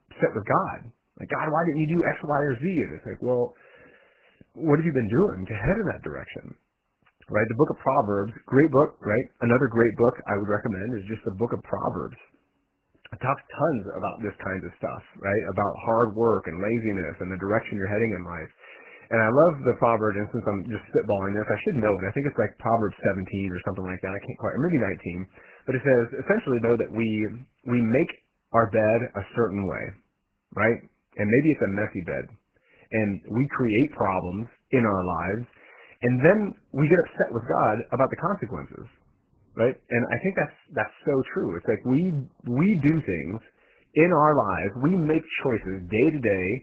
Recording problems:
garbled, watery; badly

